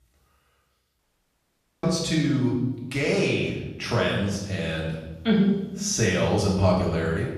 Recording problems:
off-mic speech; far
room echo; noticeable; dies away in 0.9 s
audio cutting out; at 1 s for 1 s

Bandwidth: 14.5 kHz